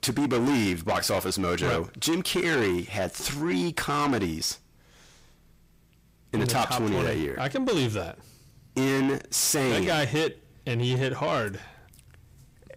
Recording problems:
distortion; heavy; 7 dB below the speech

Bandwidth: 15.5 kHz